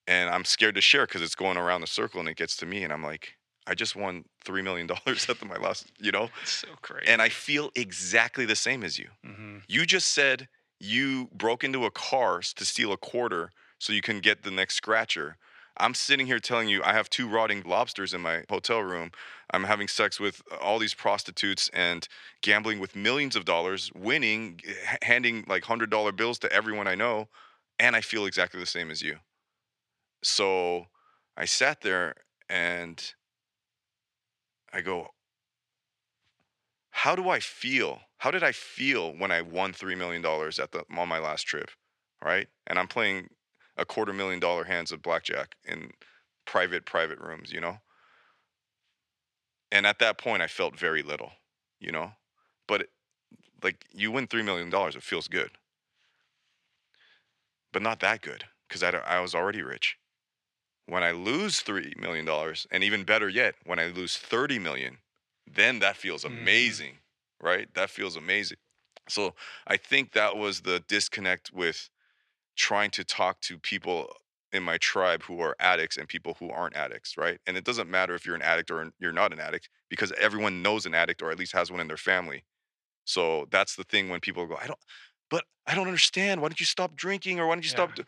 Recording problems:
thin; somewhat; fading below 950 Hz

